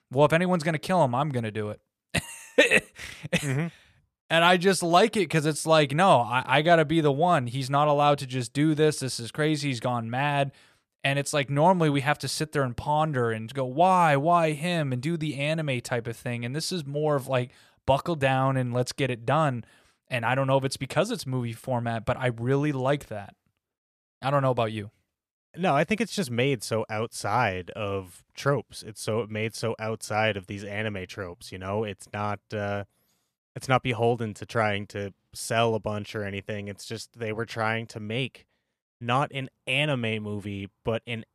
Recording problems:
none

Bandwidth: 14.5 kHz